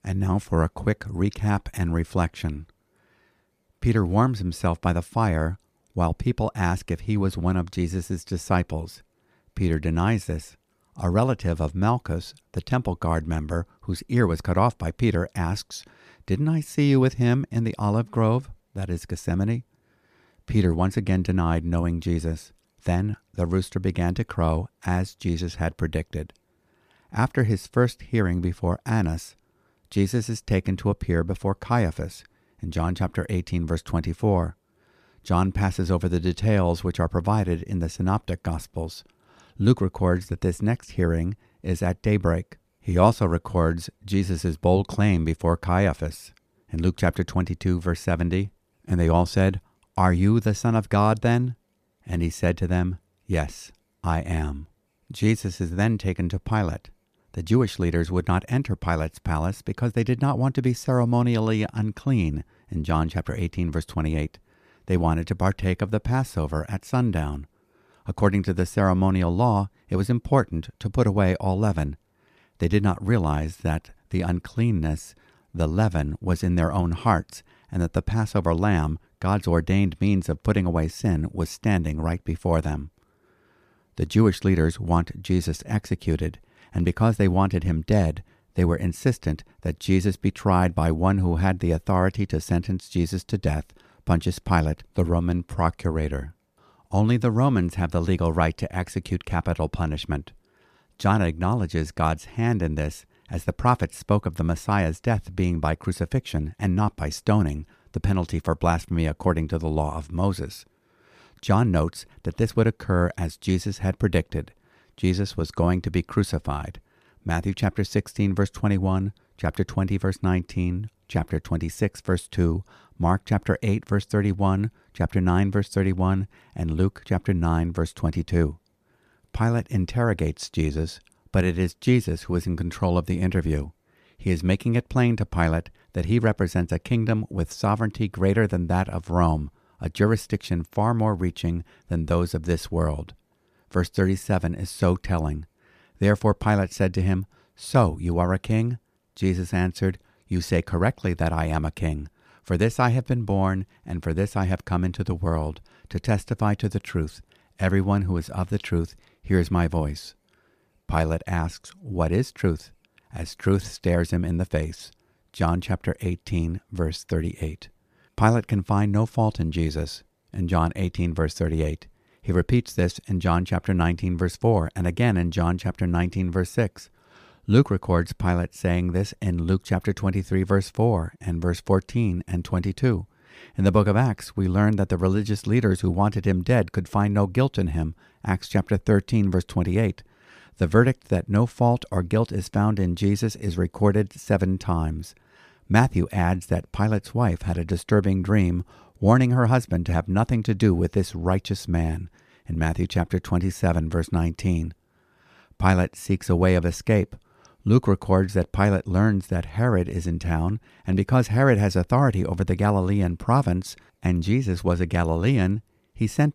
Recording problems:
none

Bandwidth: 14.5 kHz